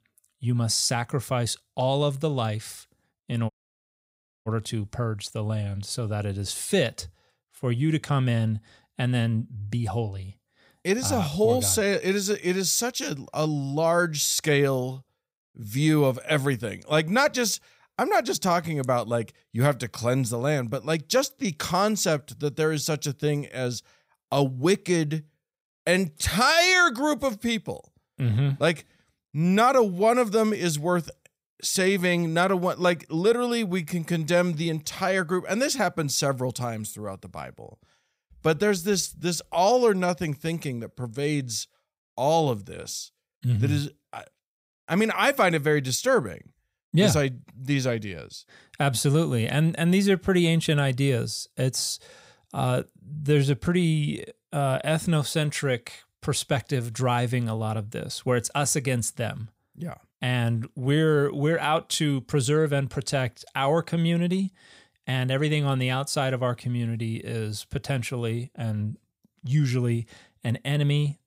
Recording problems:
audio cutting out; at 3.5 s for 1 s

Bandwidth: 15.5 kHz